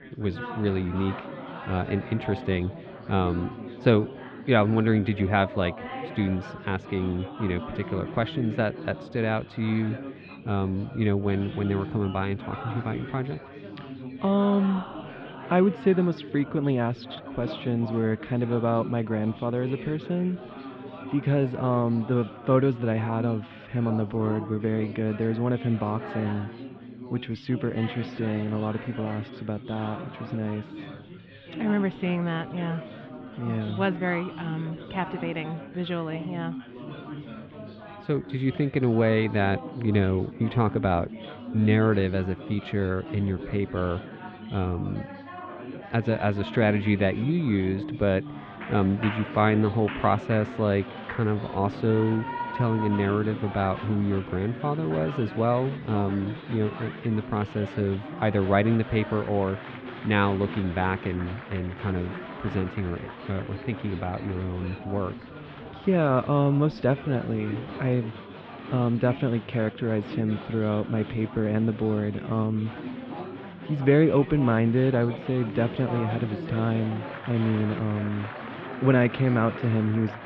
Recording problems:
muffled; very; fading above 3.5 kHz
chatter from many people; noticeable; throughout; 10 dB below the speech

